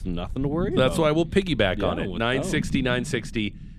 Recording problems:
low rumble; noticeable; throughout; 15 dB below the speech

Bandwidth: 15 kHz